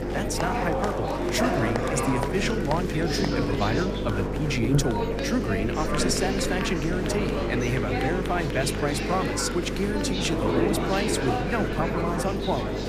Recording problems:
electrical hum; loud; throughout; 50 Hz, 6 dB below the speech
chatter from many people; loud; throughout; as loud as the speech

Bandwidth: 15 kHz